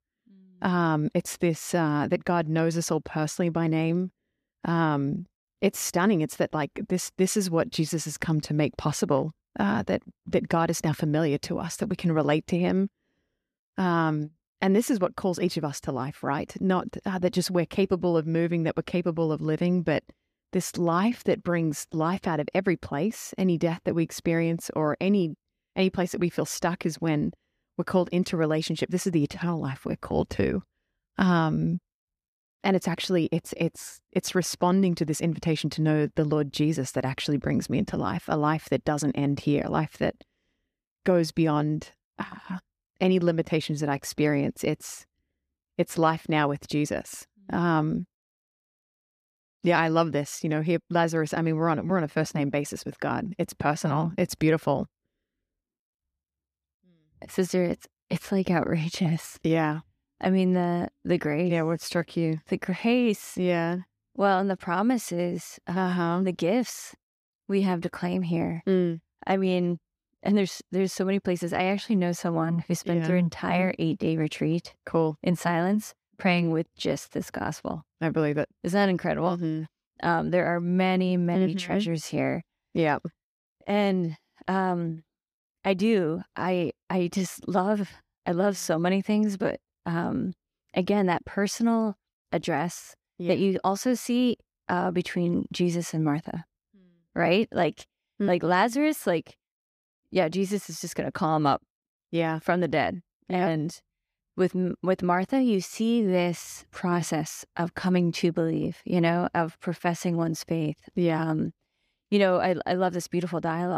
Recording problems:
abrupt cut into speech; at the end

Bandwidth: 14.5 kHz